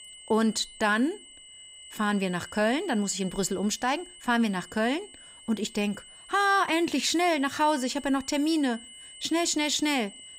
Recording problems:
high-pitched whine; noticeable; throughout; 3 kHz, 20 dB below the speech

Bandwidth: 15.5 kHz